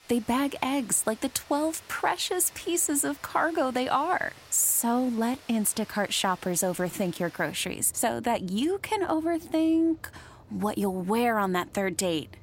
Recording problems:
rain or running water; faint; throughout; 25 dB below the speech

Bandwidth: 16 kHz